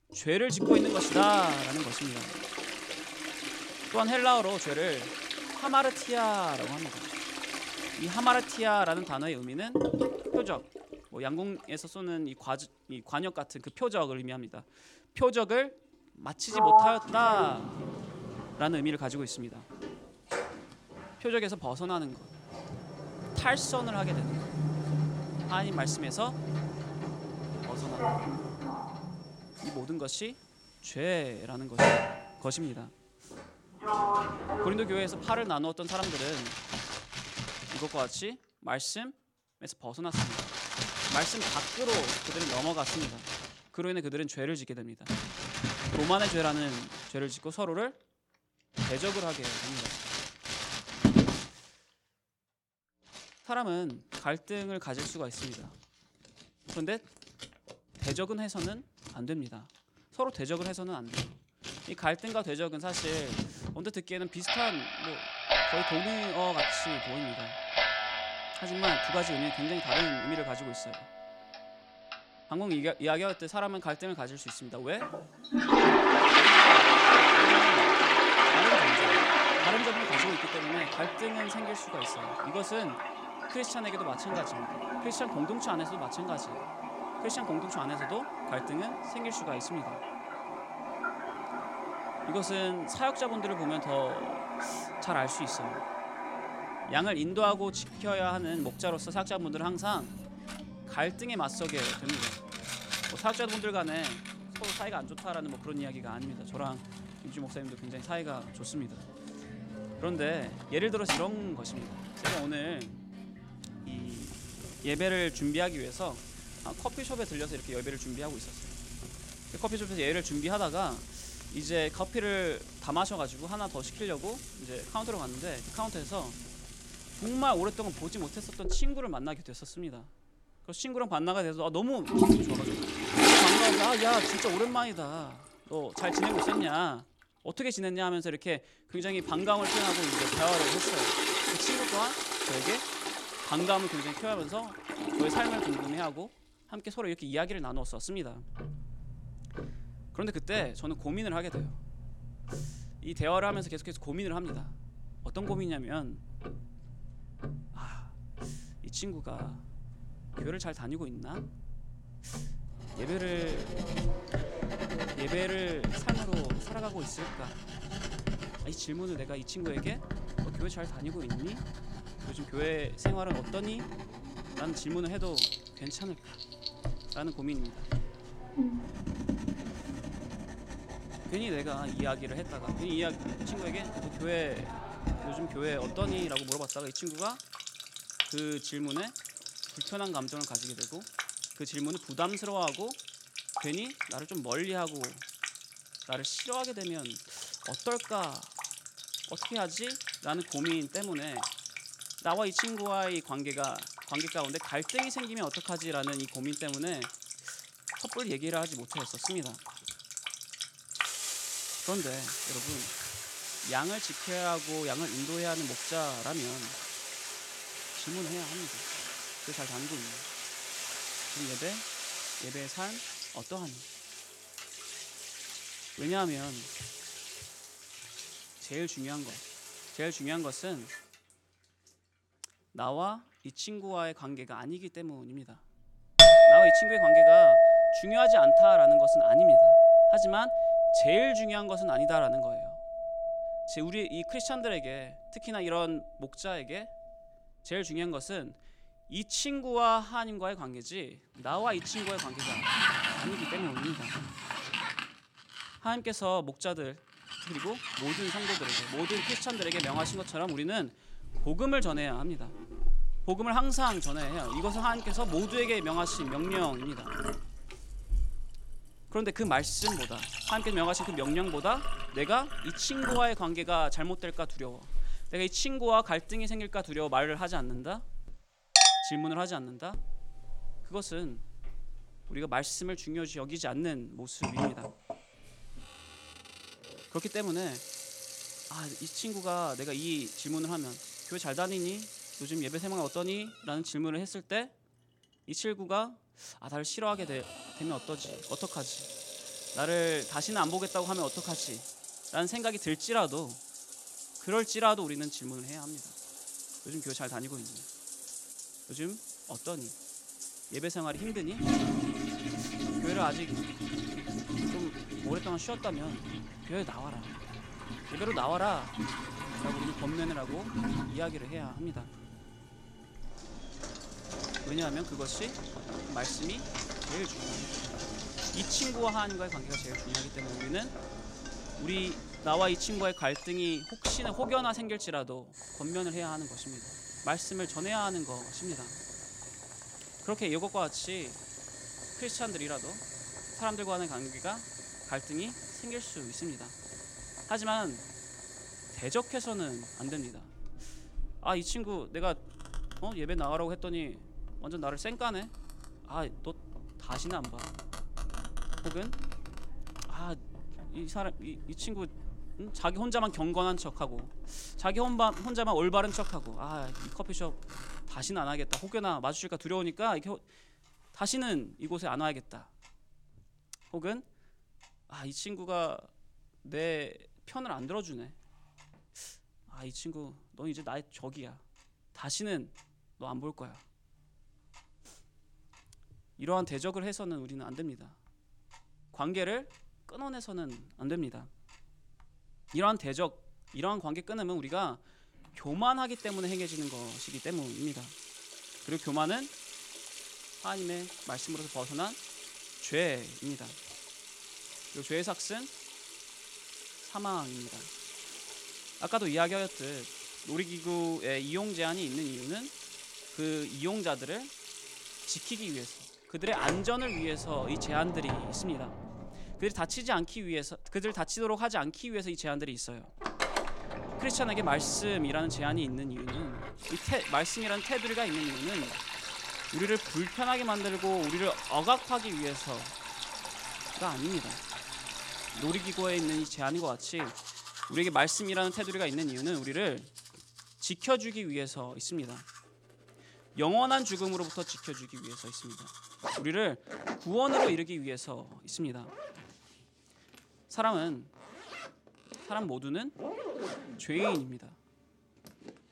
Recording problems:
household noises; very loud; throughout; 4 dB above the speech

